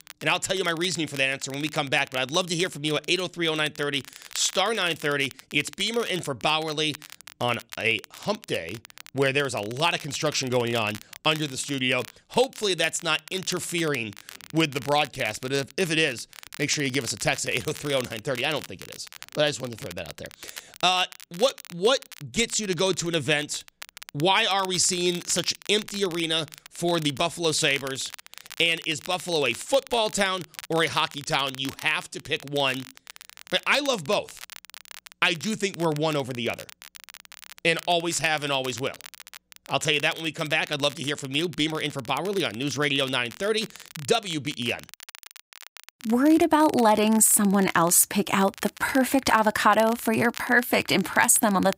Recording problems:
crackle, like an old record; noticeable; 20 dB below the speech

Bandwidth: 15.5 kHz